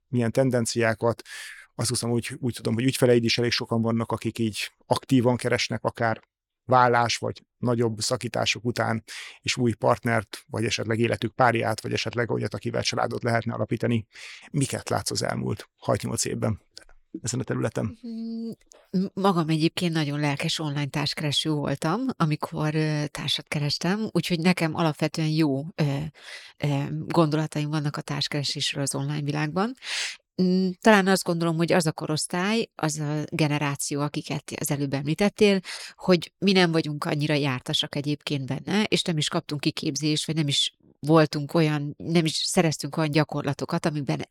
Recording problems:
none

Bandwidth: 17.5 kHz